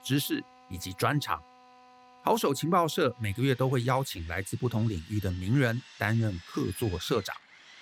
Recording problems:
machinery noise; faint; throughout; 20 dB below the speech

